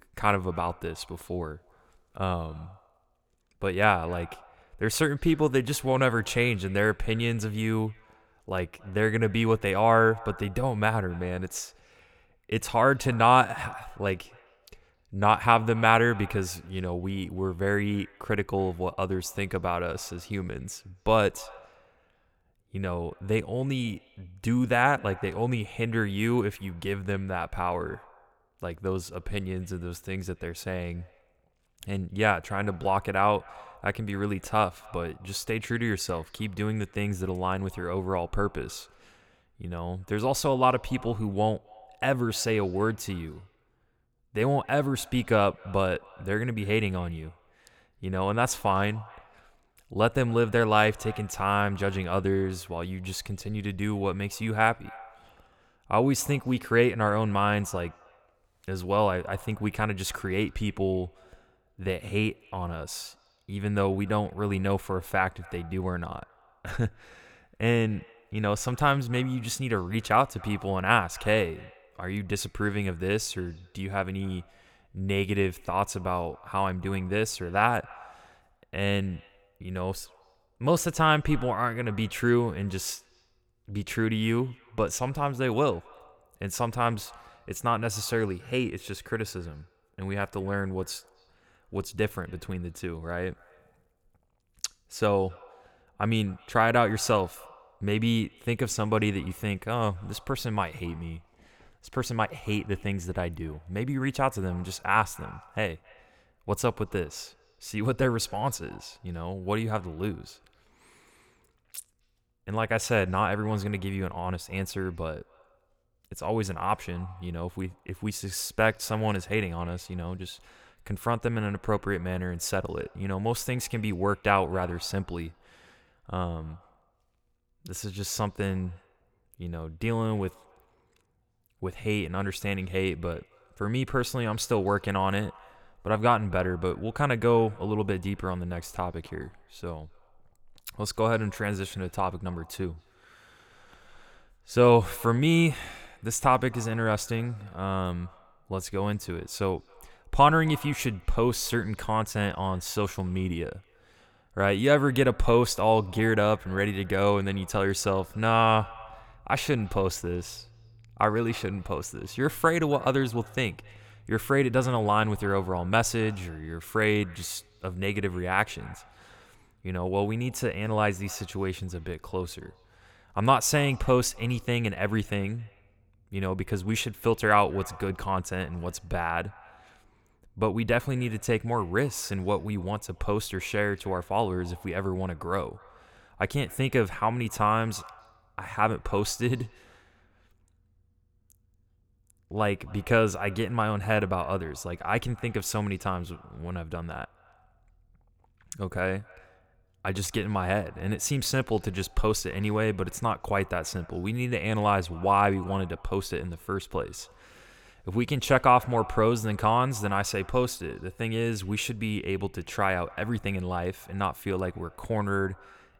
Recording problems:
echo of what is said; faint; throughout; 260 ms later, 25 dB below the speech

